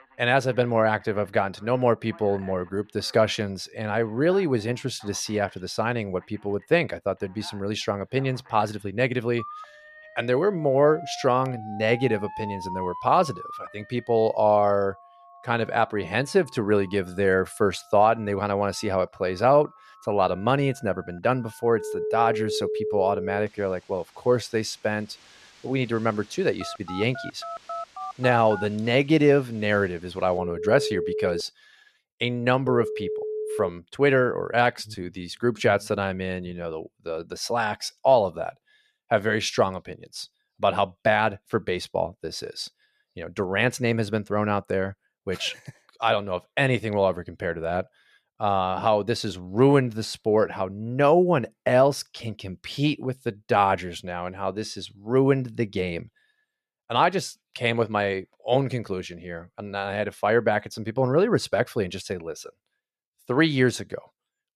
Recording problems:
alarms or sirens; loud; until 36 s; 10 dB below the speech

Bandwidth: 14.5 kHz